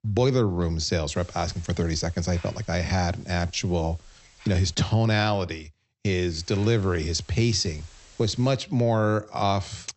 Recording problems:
high frequencies cut off; noticeable; nothing above 8 kHz
hiss; faint; from 1 to 5 s and from 6.5 to 8.5 s; 25 dB below the speech

